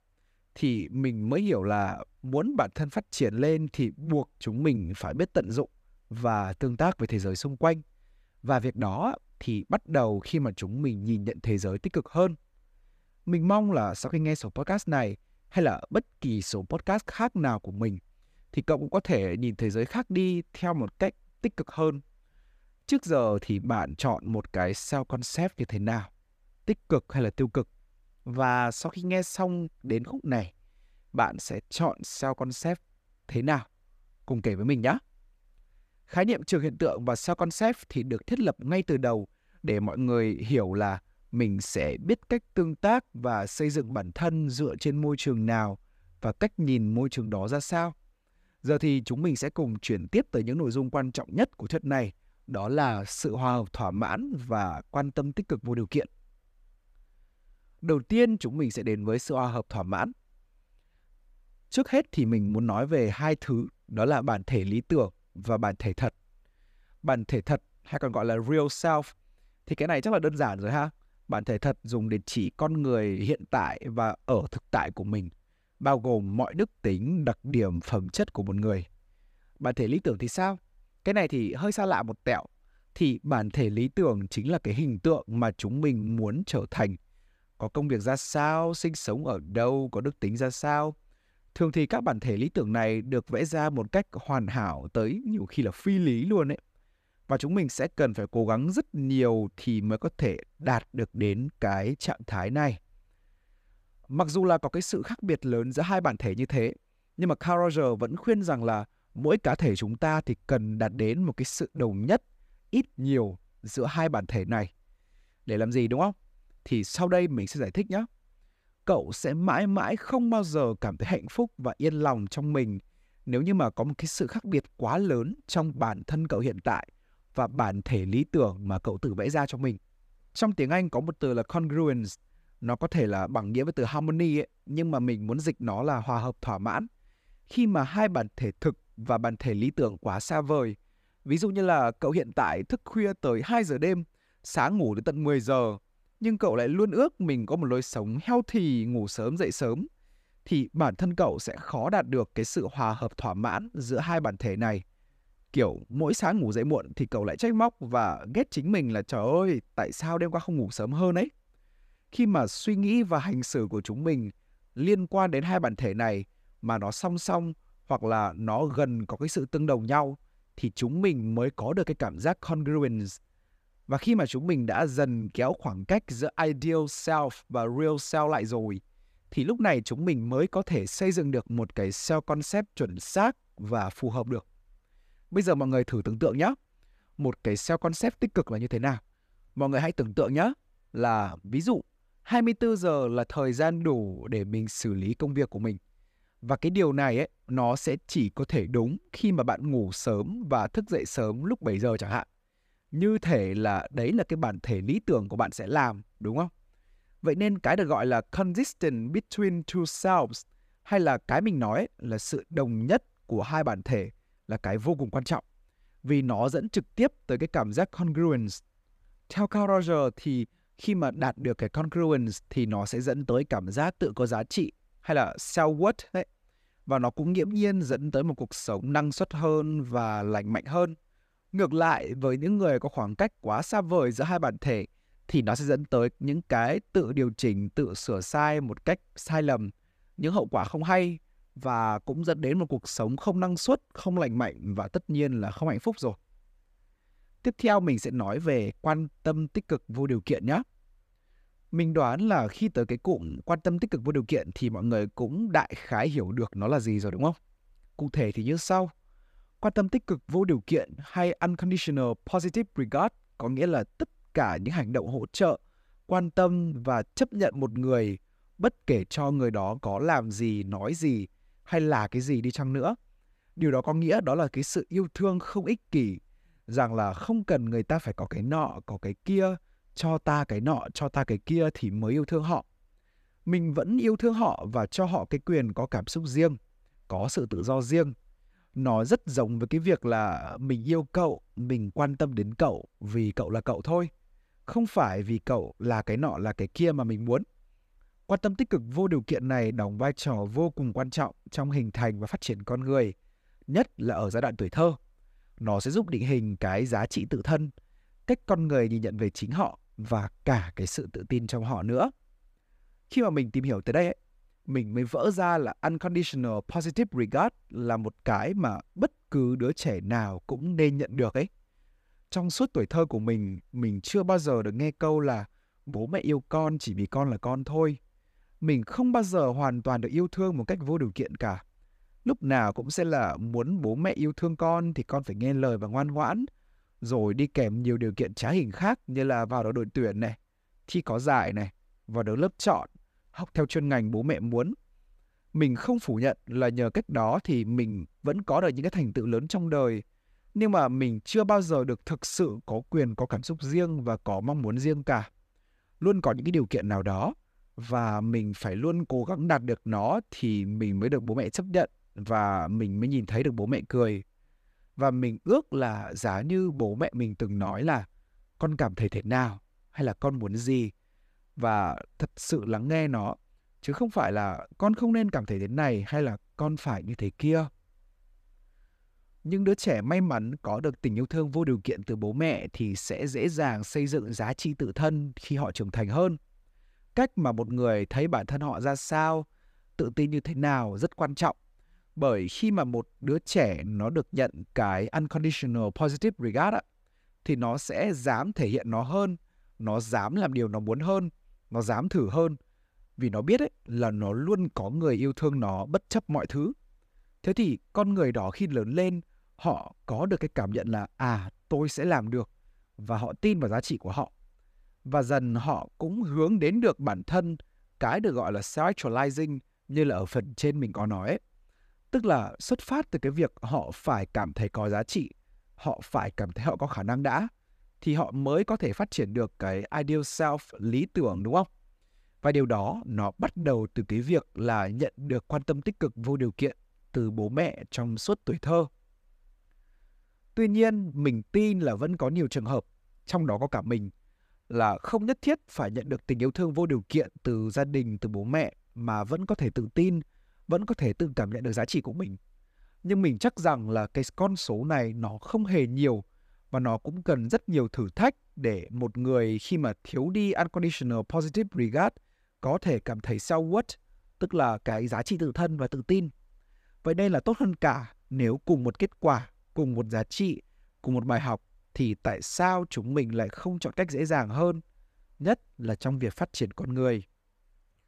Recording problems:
none

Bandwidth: 14.5 kHz